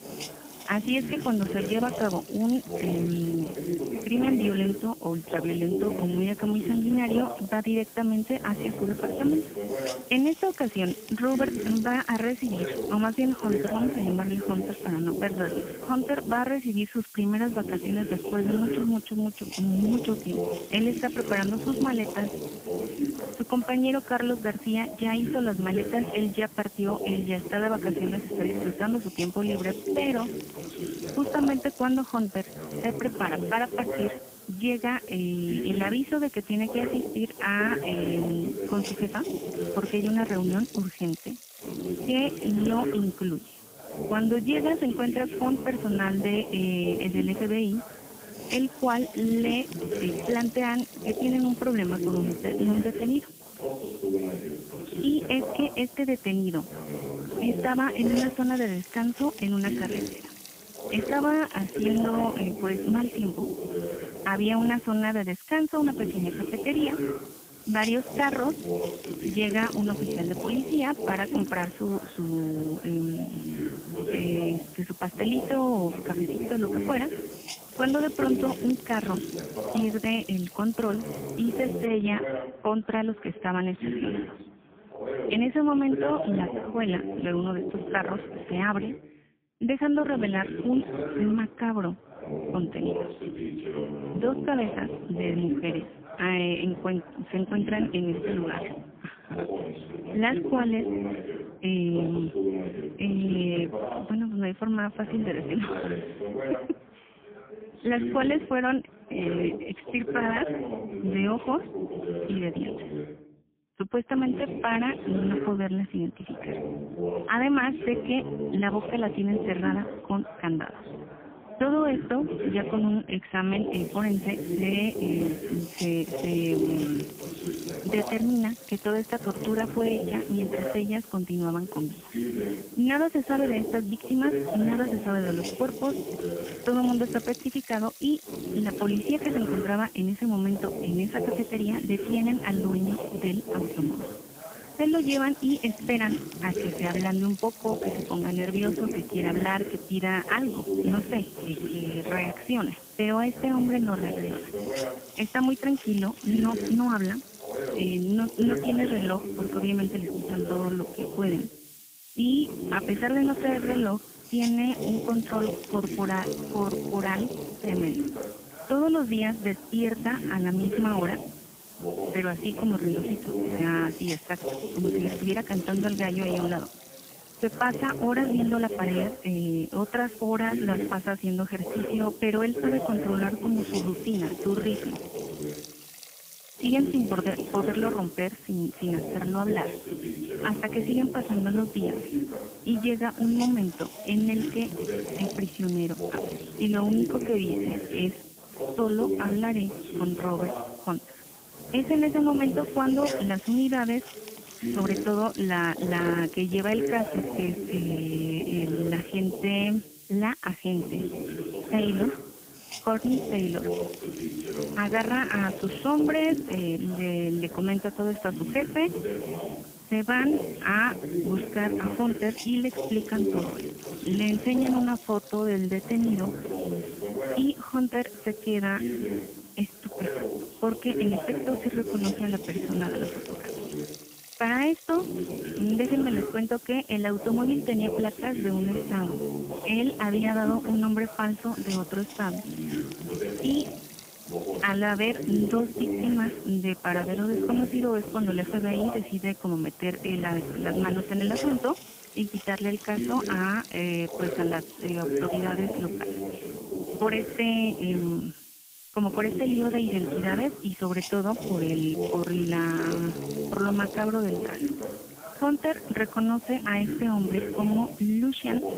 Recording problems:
phone-call audio; poor line; nothing above 3.5 kHz
voice in the background; loud; throughout; 6 dB below the speech
hiss; noticeable; until 1:22 and from 2:04 on; 15 dB below the speech

